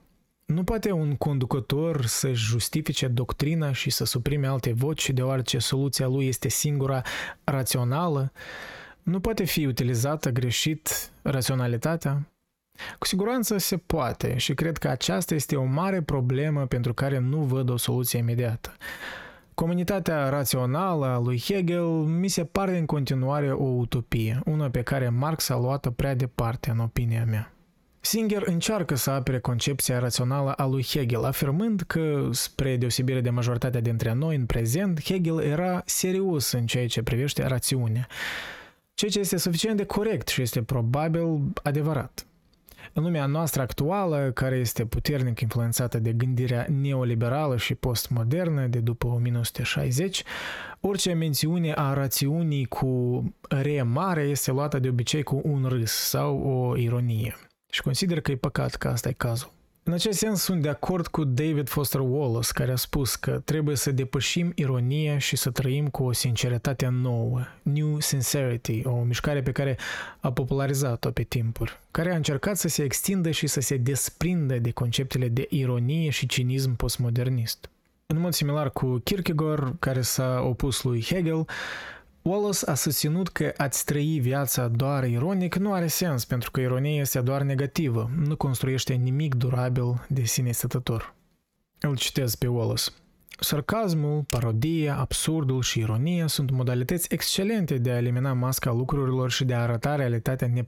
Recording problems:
squashed, flat; heavily

